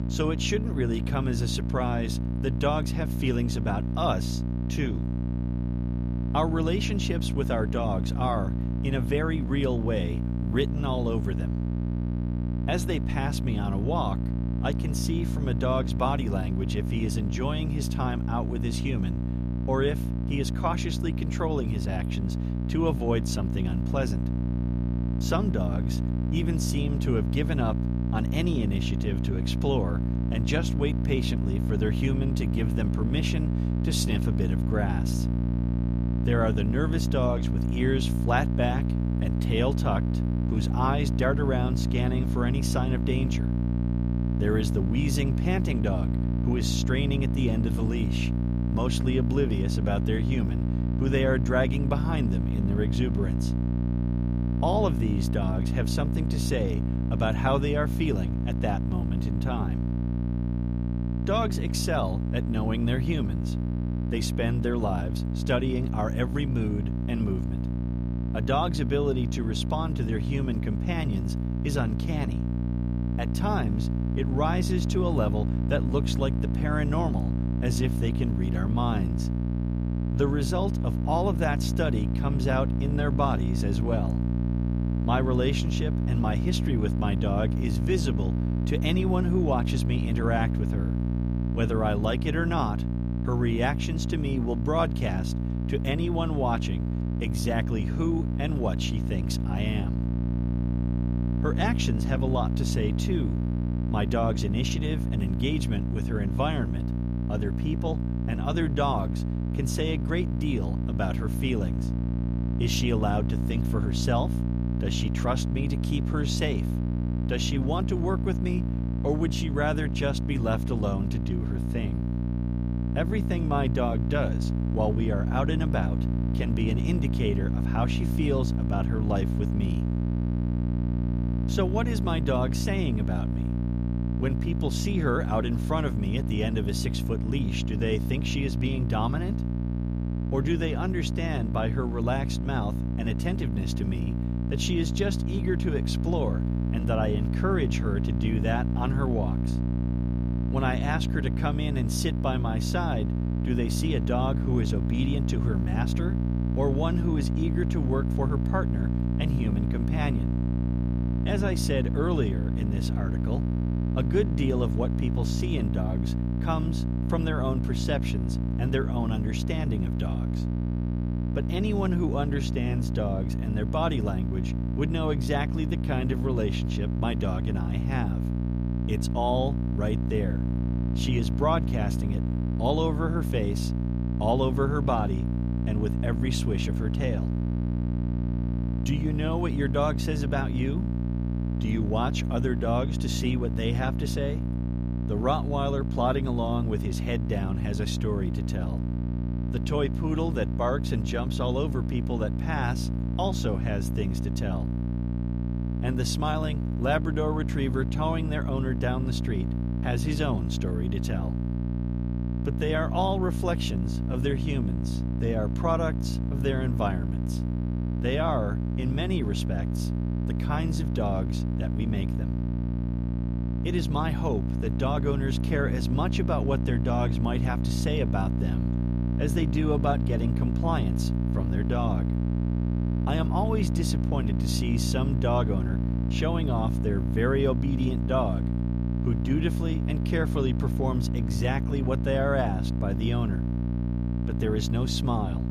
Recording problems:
electrical hum; loud; throughout; 60 Hz, 6 dB below the speech

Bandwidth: 14.5 kHz